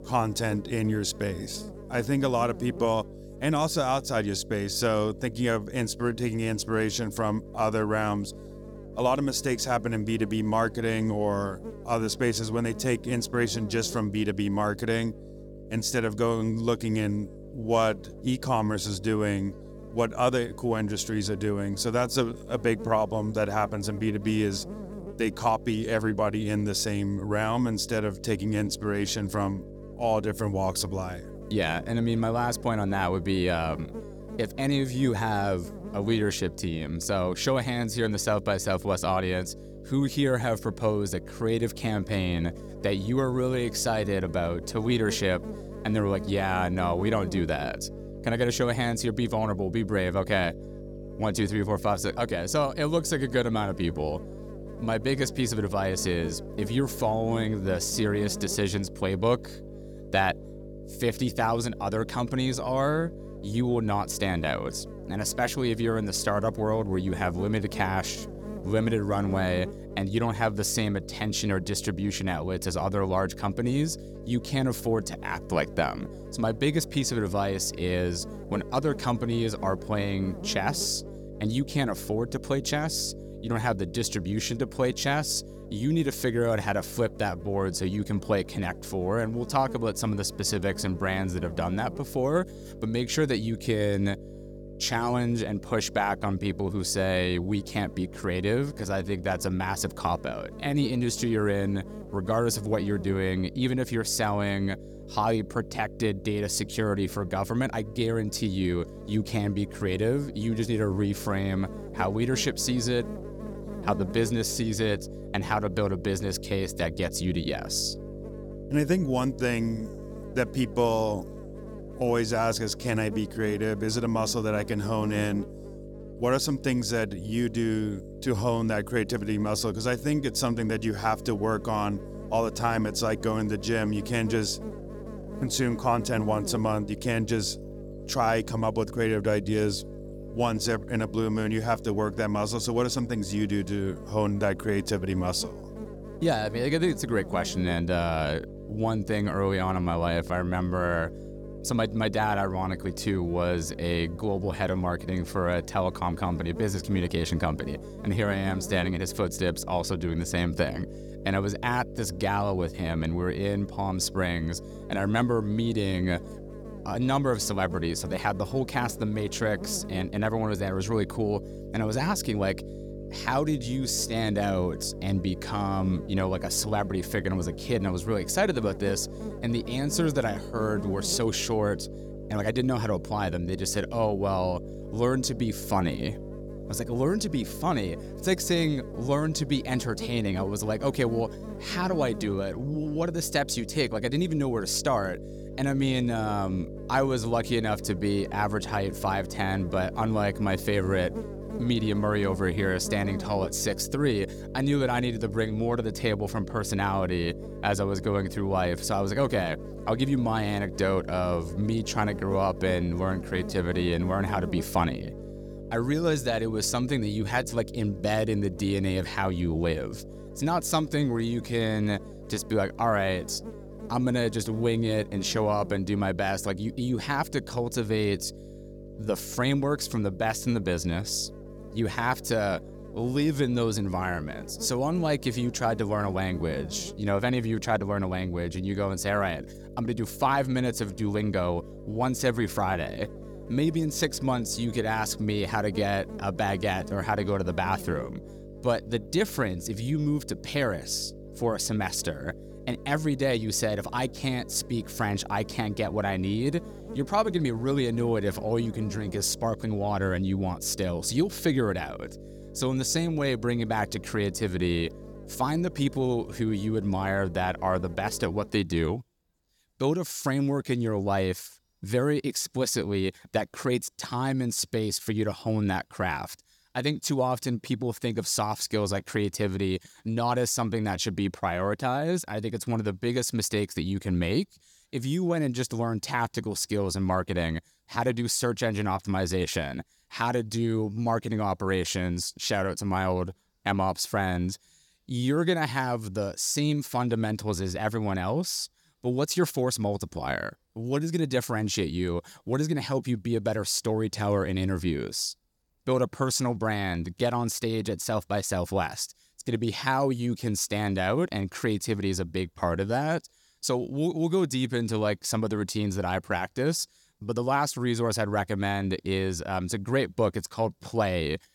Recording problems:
electrical hum; noticeable; until 4:28; 50 Hz, 15 dB below the speech

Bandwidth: 17.5 kHz